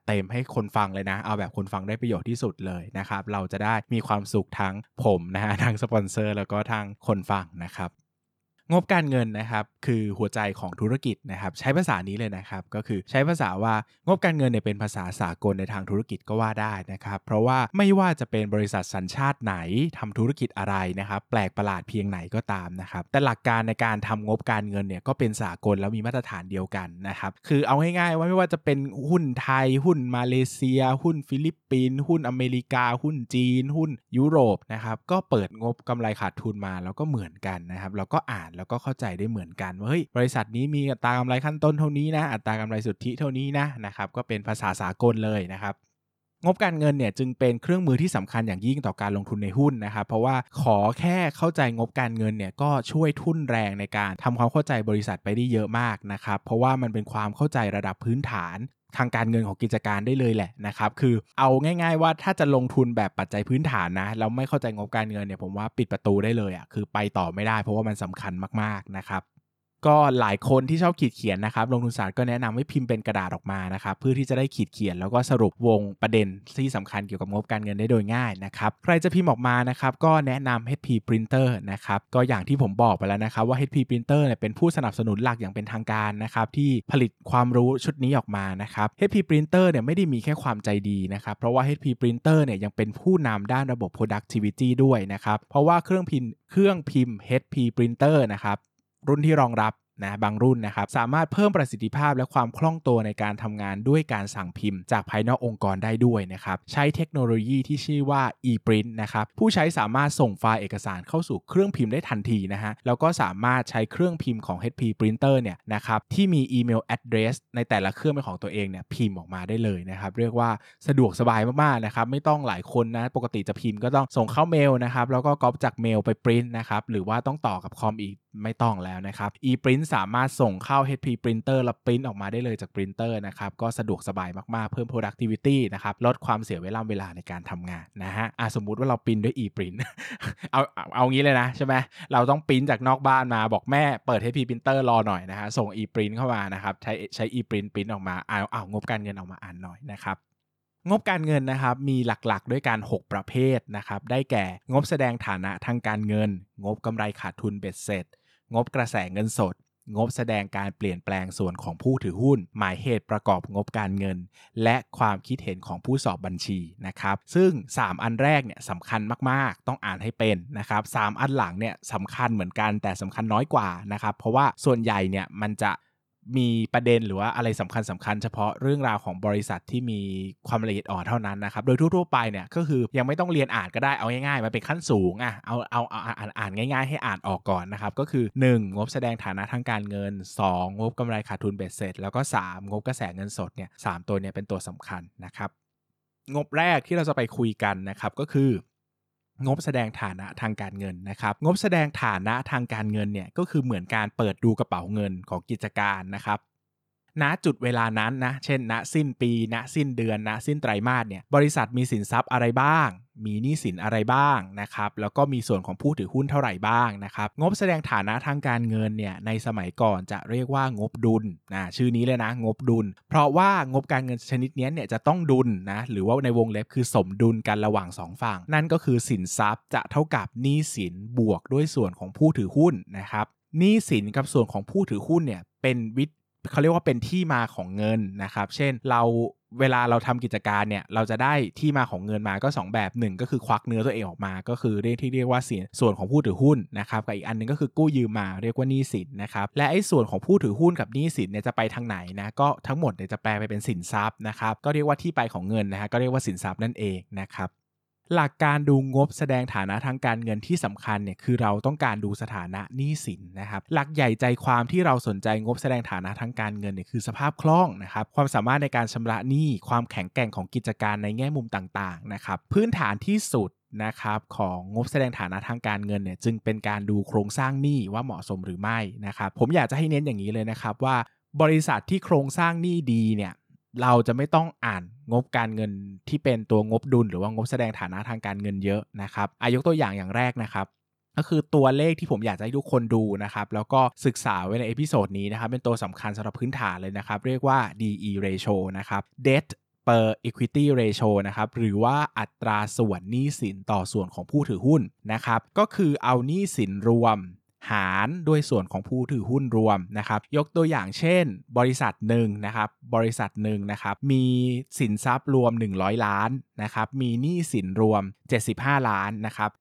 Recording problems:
none

